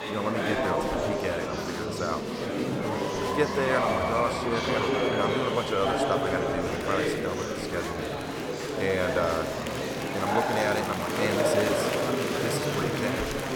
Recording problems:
murmuring crowd; very loud; throughout; 3 dB above the speech

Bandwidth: 18 kHz